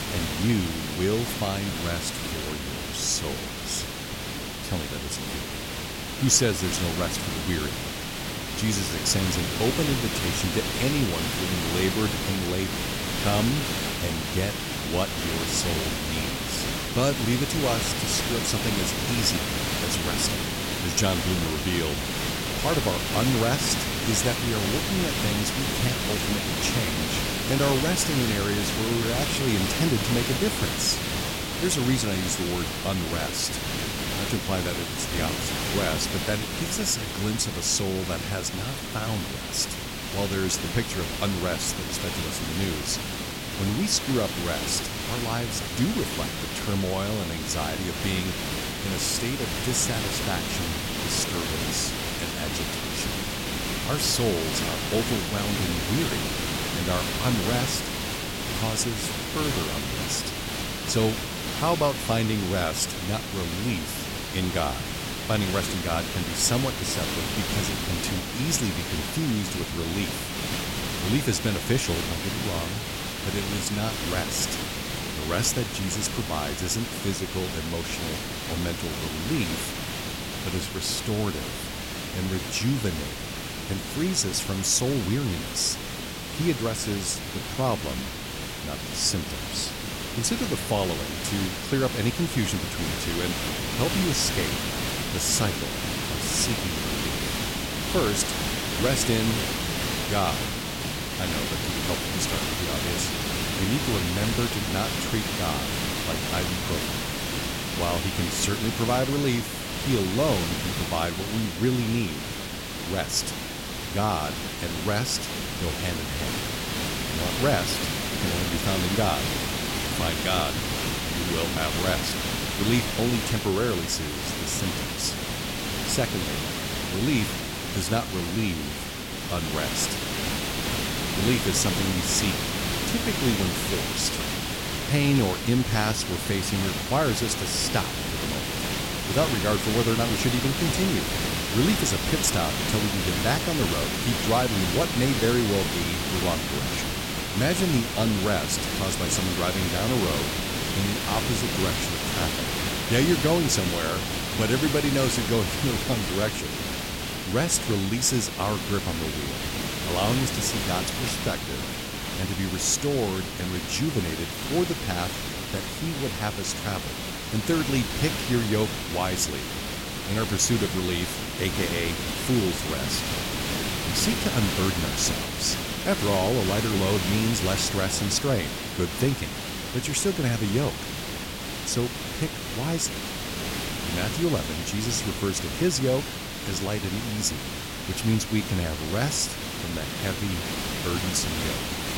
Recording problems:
hiss; loud; throughout; 1 dB below the speech

